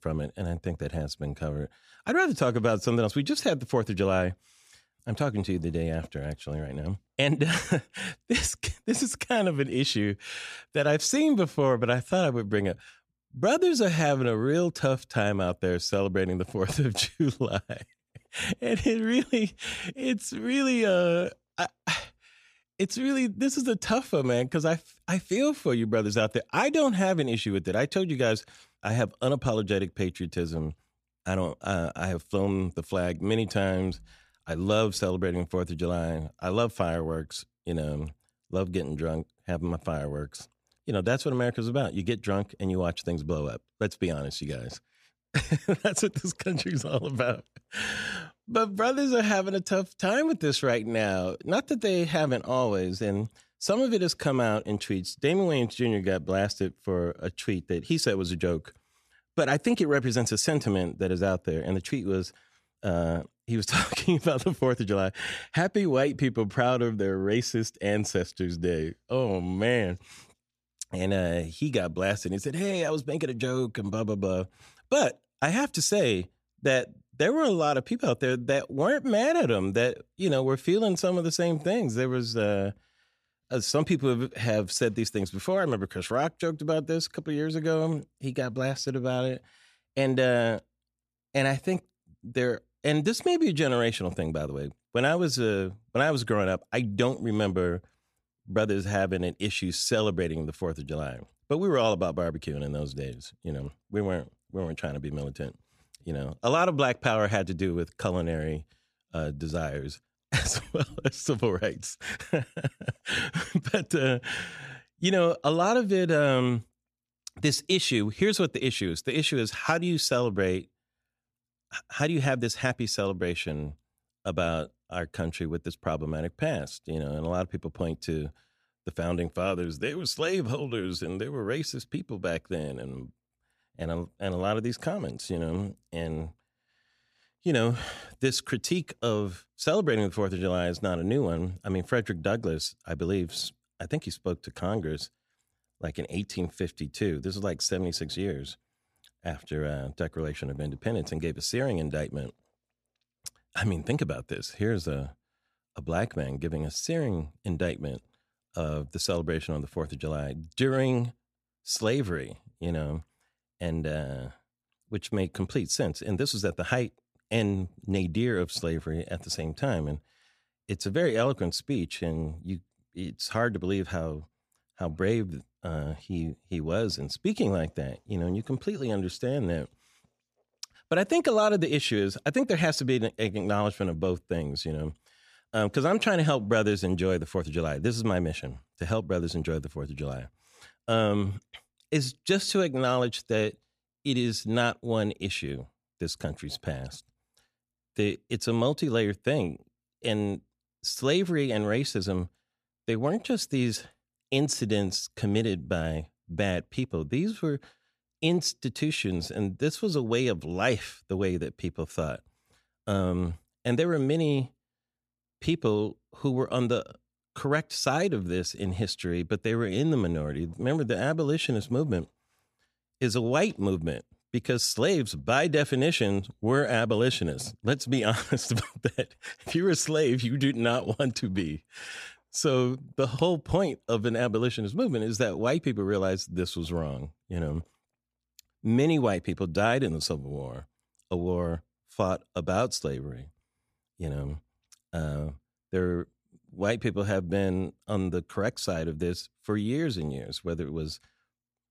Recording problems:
none

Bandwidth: 14.5 kHz